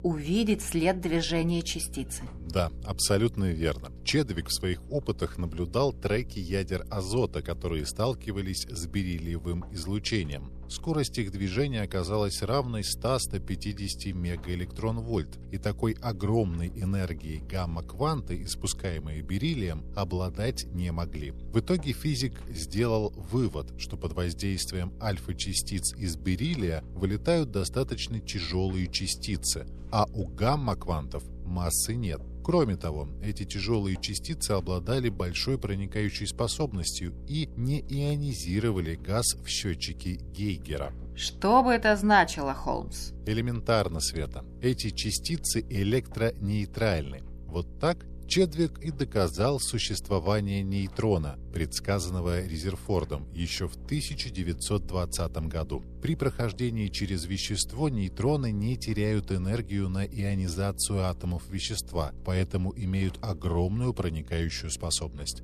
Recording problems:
electrical hum; faint; throughout; 60 Hz, 25 dB below the speech

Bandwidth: 13.5 kHz